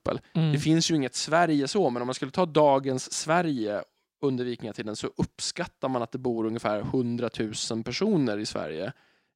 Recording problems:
none

